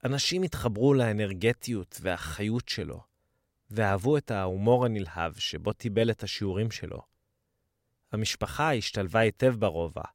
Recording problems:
none

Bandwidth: 16 kHz